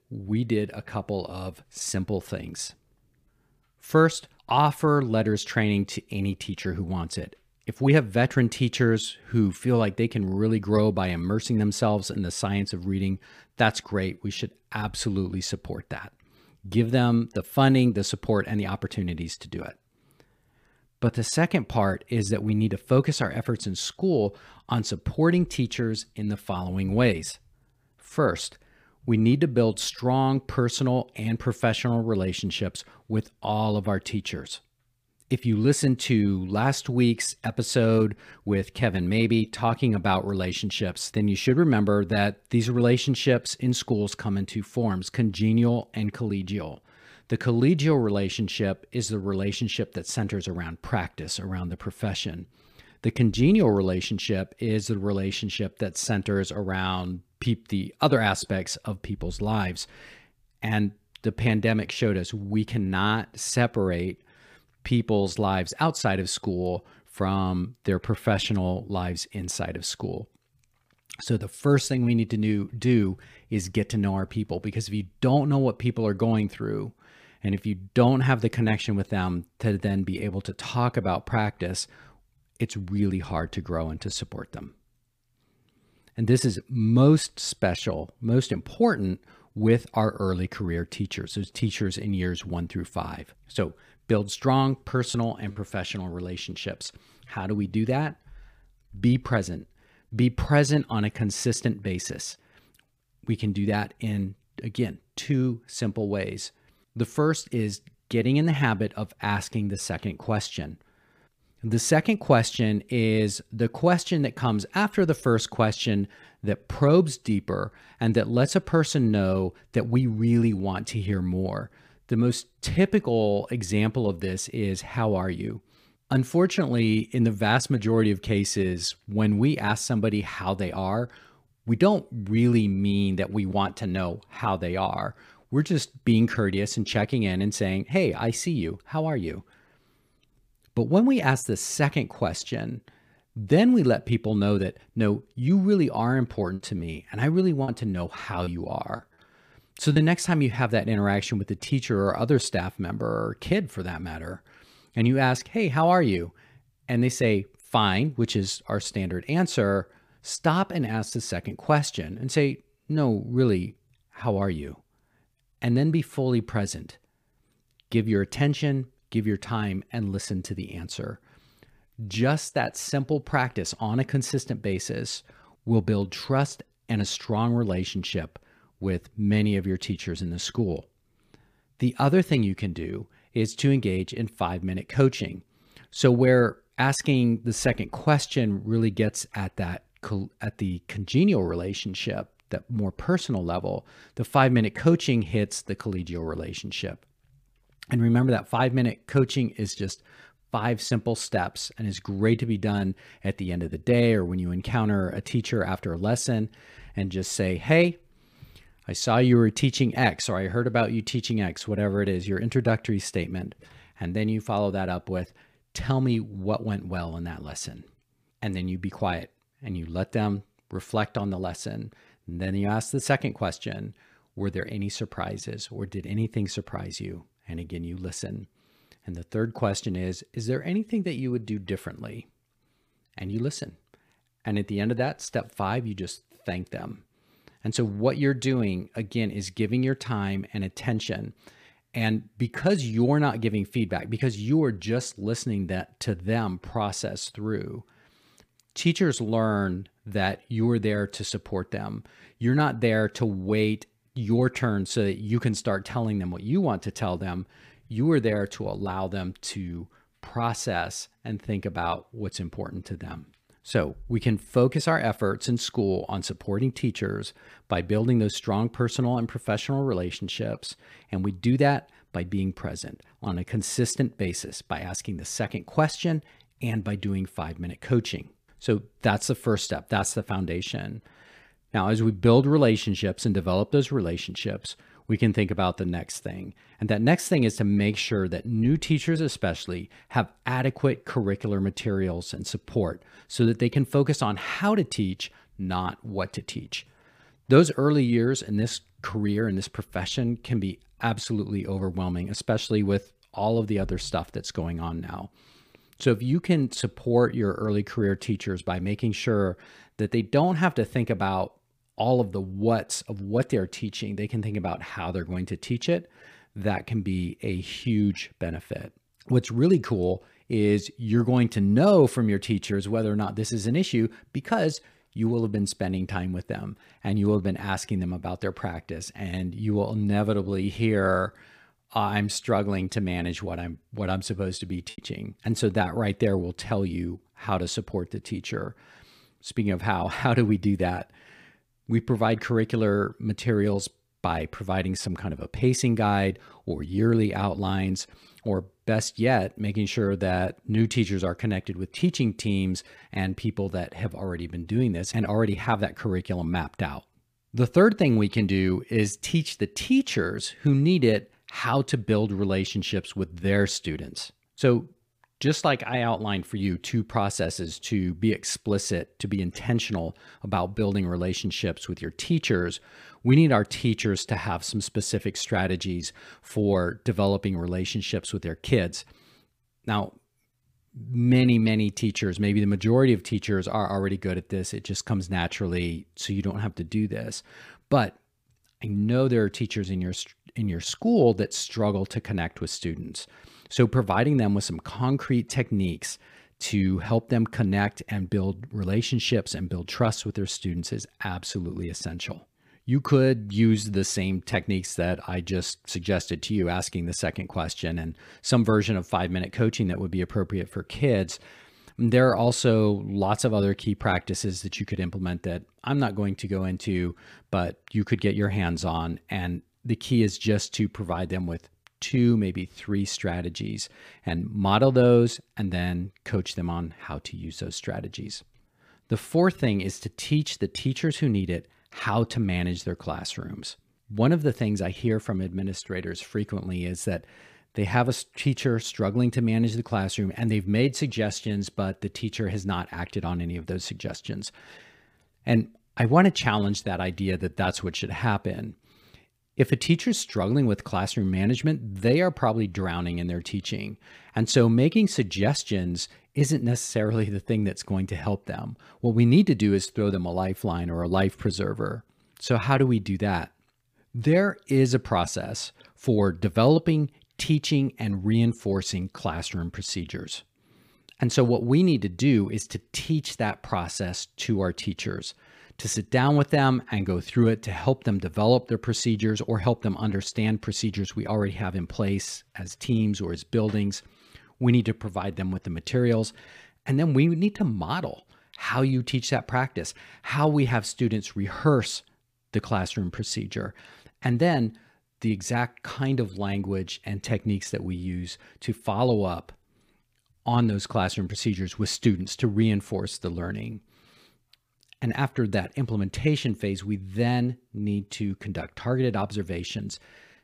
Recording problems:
choppy; occasionally; at 1:35, from 2:27 to 2:30 and at 5:35; 5% of the speech affected

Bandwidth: 15 kHz